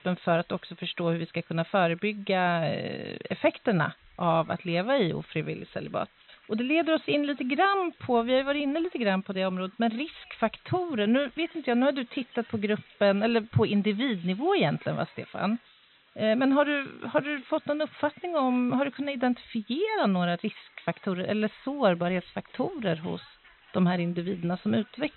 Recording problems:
high frequencies cut off; severe; nothing above 4 kHz
hiss; faint; throughout; 25 dB below the speech

